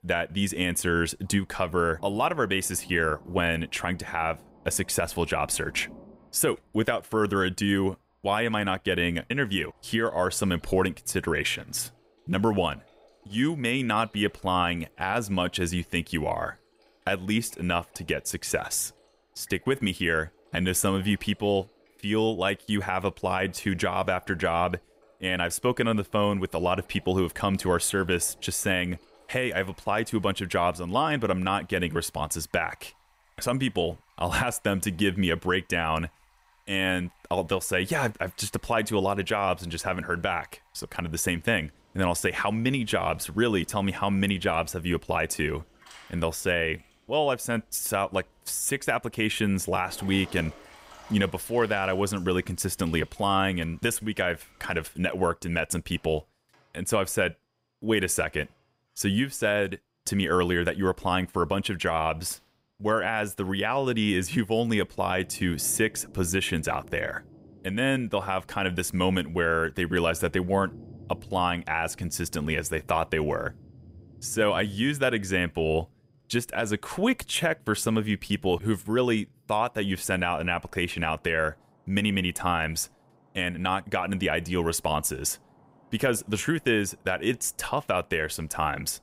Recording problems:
rain or running water; faint; throughout; 30 dB below the speech

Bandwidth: 15.5 kHz